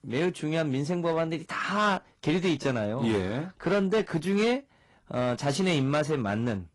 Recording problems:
distortion; slight; 7% of the sound clipped
garbled, watery; slightly; nothing above 10.5 kHz

